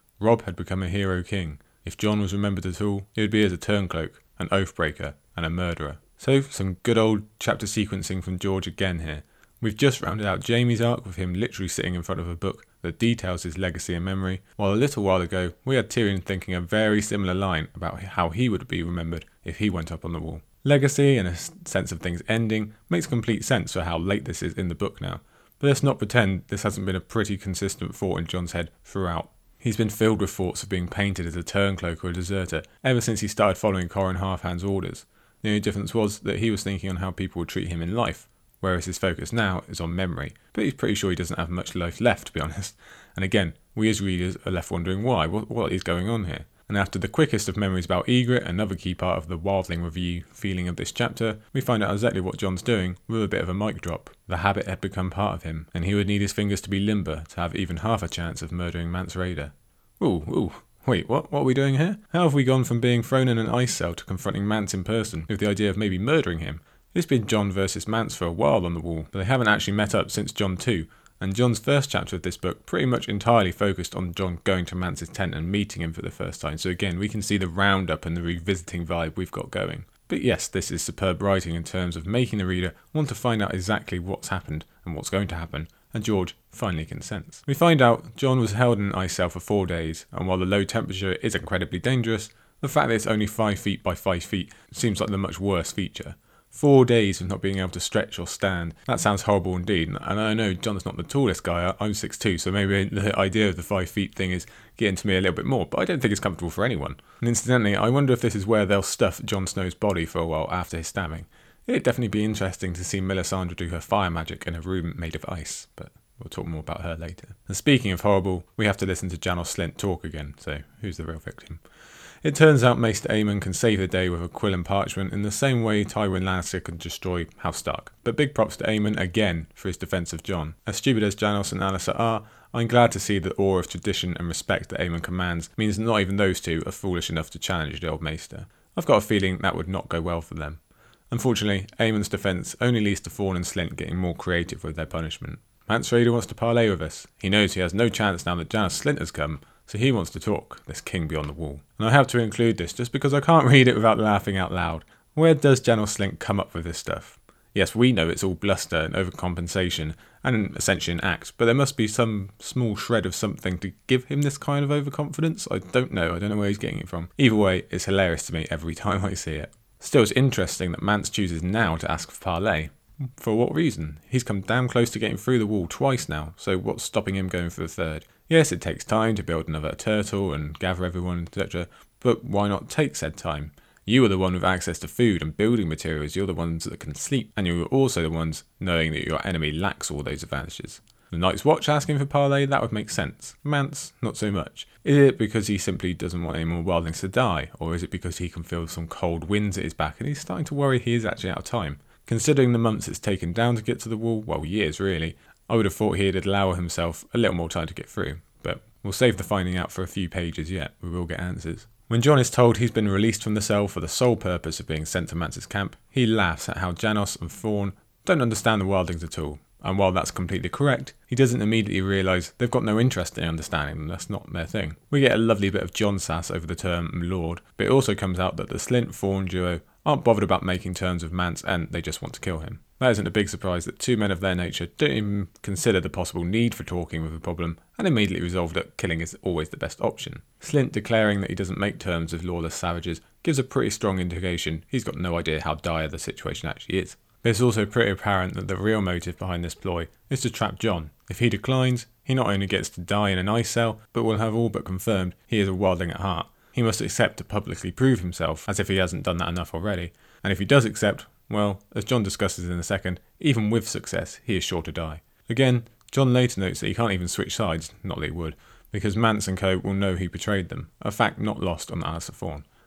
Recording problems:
none

